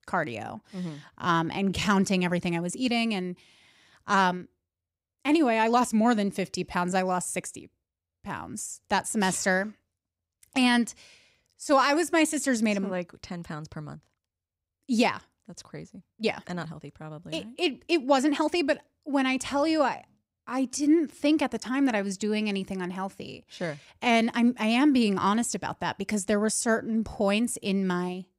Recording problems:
uneven, jittery; strongly; from 1 to 27 s

